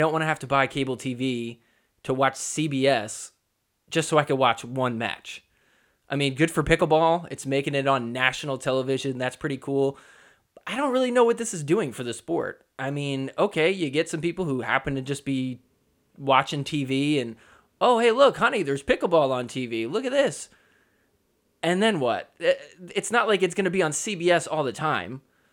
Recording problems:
abrupt cut into speech; at the start

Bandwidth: 17.5 kHz